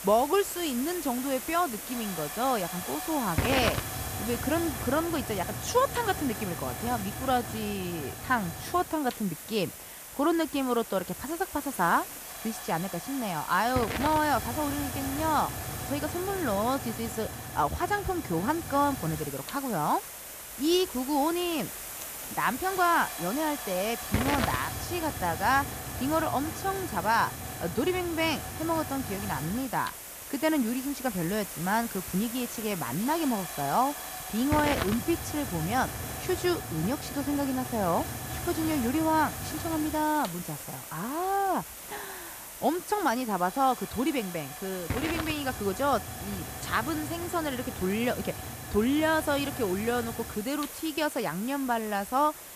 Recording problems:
hiss; loud; throughout; 6 dB below the speech

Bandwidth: 14.5 kHz